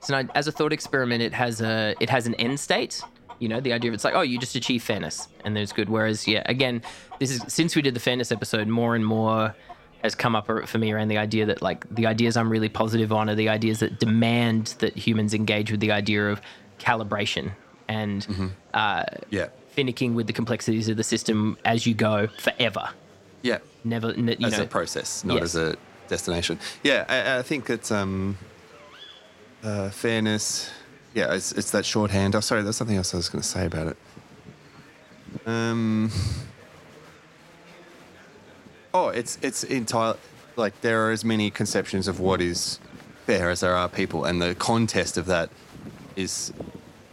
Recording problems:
animal sounds; faint; throughout; 20 dB below the speech
chatter from many people; faint; throughout; 25 dB below the speech

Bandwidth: 16 kHz